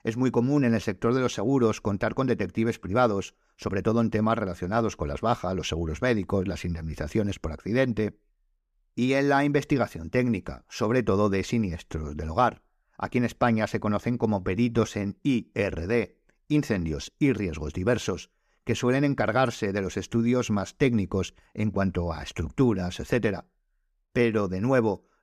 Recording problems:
none

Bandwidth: 14.5 kHz